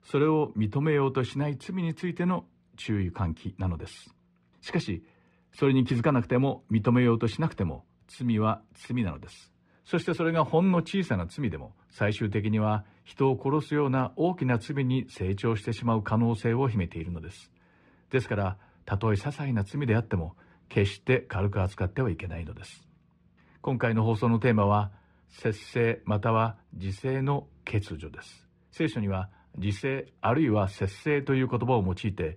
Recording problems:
muffled; very; fading above 3 kHz

